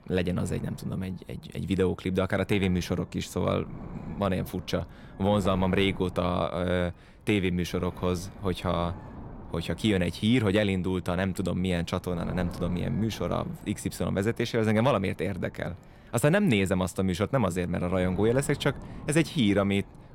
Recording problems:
wind noise on the microphone; occasional gusts; 20 dB below the speech

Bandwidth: 16.5 kHz